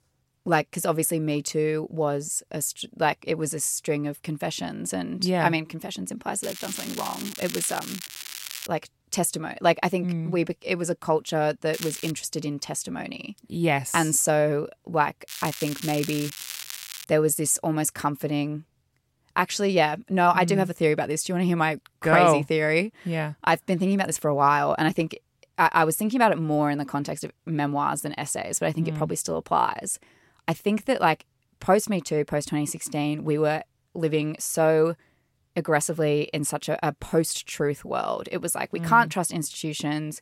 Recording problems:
crackling; loud; from 6.5 to 8.5 s, at 12 s and from 15 to 17 s; 10 dB below the speech

